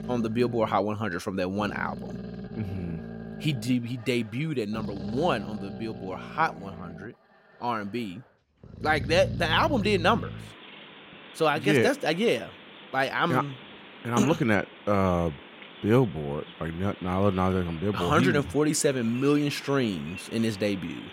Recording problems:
animal sounds; noticeable; throughout; 15 dB below the speech

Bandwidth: 16 kHz